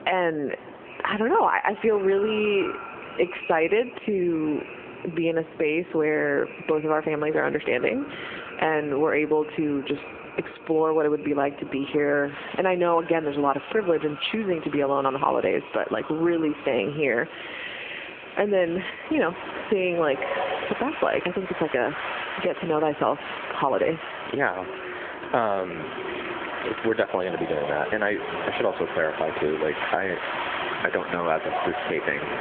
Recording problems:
squashed, flat; heavily, background pumping
echo of what is said; noticeable; throughout; 390 ms later, 15 dB below the speech
phone-call audio
wind in the background; loud; throughout; 9 dB below the speech

